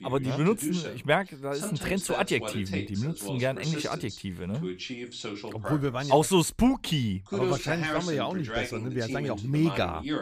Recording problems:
voice in the background; loud; throughout; 7 dB below the speech

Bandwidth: 14.5 kHz